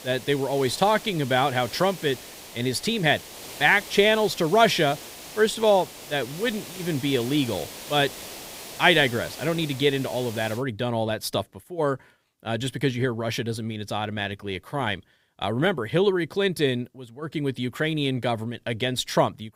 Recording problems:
hiss; noticeable; until 11 s; 15 dB below the speech

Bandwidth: 15.5 kHz